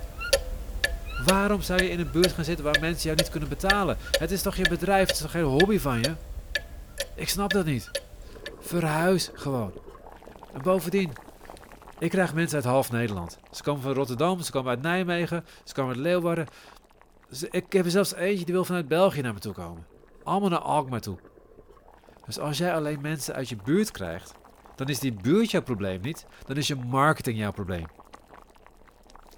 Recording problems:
household noises; loud; throughout; 4 dB below the speech

